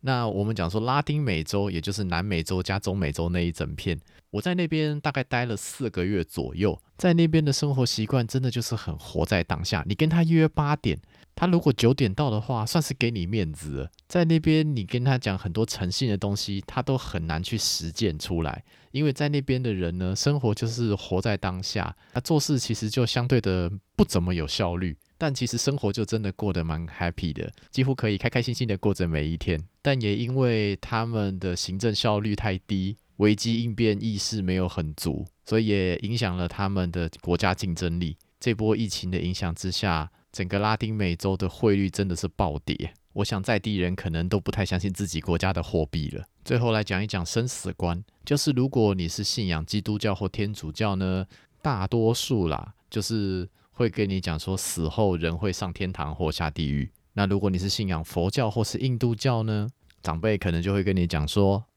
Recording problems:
uneven, jittery; strongly; from 4.5 to 54 s

